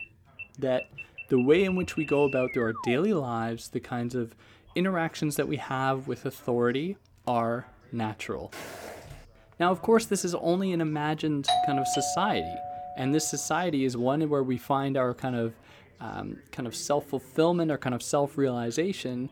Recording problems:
background chatter; faint; throughout; 2 voices, 25 dB below the speech
alarm; noticeable; until 3 s; peak 7 dB below the speech
footsteps; faint; at 8.5 s; peak 10 dB below the speech
doorbell; loud; from 11 to 13 s; peak 3 dB above the speech

